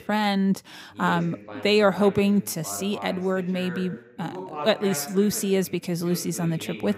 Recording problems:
voice in the background; noticeable; throughout; 15 dB below the speech

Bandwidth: 15.5 kHz